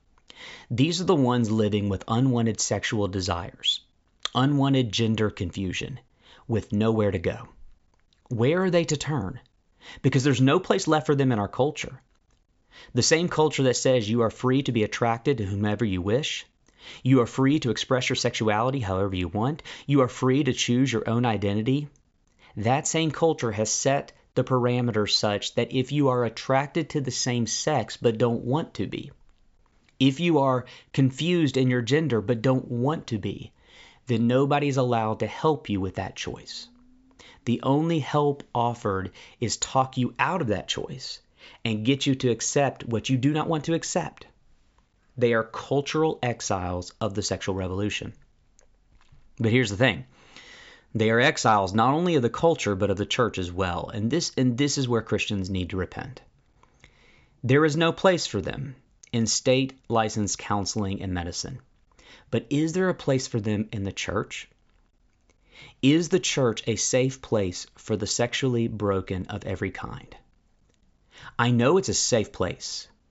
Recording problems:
high frequencies cut off; noticeable; nothing above 8 kHz

